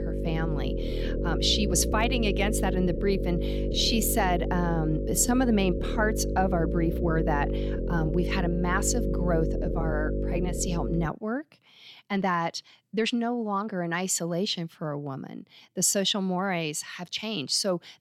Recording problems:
electrical hum; loud; until 11 s; 50 Hz, 6 dB below the speech
uneven, jittery; strongly; from 0.5 to 17 s

